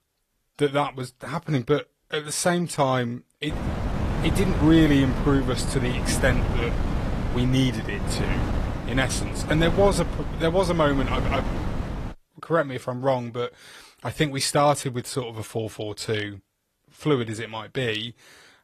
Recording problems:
garbled, watery; slightly
wind noise on the microphone; heavy; from 3.5 to 12 s; 8 dB below the speech

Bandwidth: 14.5 kHz